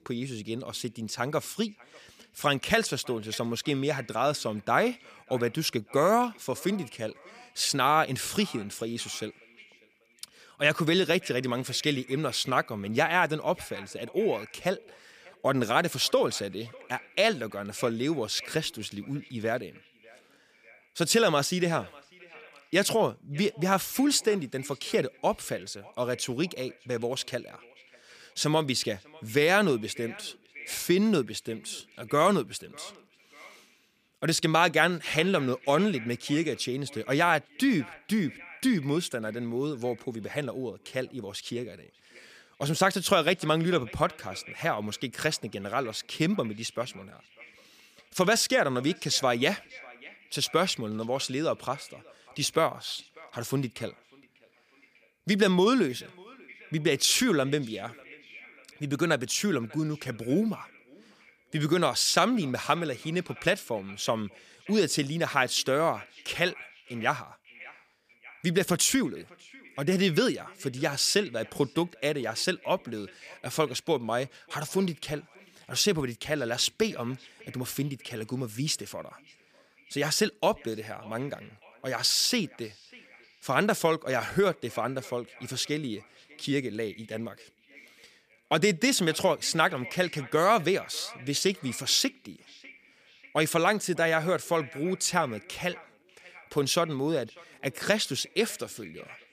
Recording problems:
echo of what is said; faint; throughout; 600 ms later, 20 dB below the speech

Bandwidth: 15 kHz